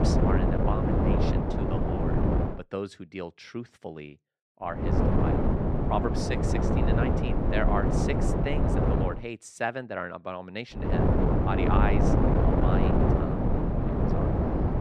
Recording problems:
wind noise on the microphone; heavy; until 2.5 s, from 5 to 9 s and from 11 s on; 4 dB above the speech

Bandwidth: 14 kHz